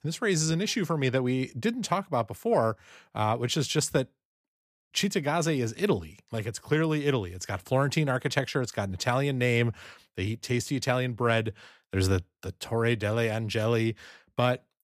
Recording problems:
none

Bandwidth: 15 kHz